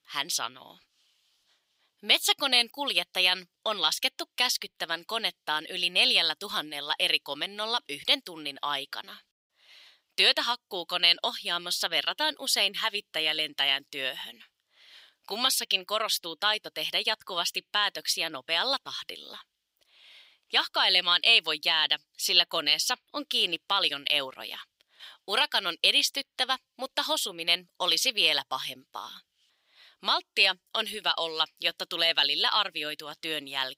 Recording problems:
thin; somewhat; fading below 900 Hz

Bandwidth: 15.5 kHz